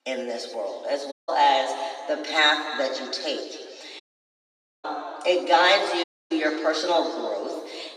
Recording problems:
off-mic speech; far
room echo; noticeable; dies away in 1.9 s
thin; somewhat; fading below 300 Hz
audio cutting out; at 1 s, at 4 s for 1 s and at 6 s

